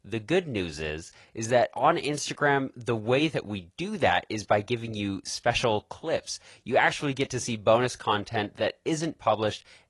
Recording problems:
garbled, watery; slightly

